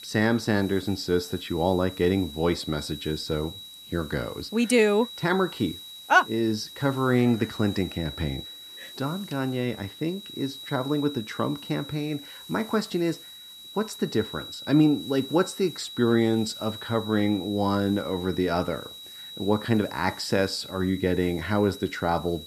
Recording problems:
high-pitched whine; noticeable; throughout; 4 kHz, 15 dB below the speech
hiss; faint; throughout; 25 dB below the speech

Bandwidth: 14 kHz